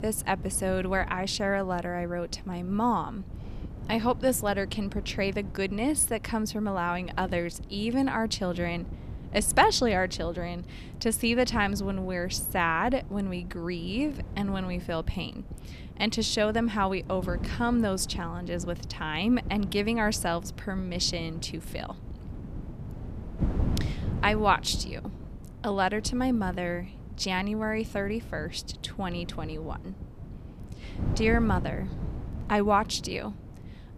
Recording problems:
wind noise on the microphone; occasional gusts; 20 dB below the speech

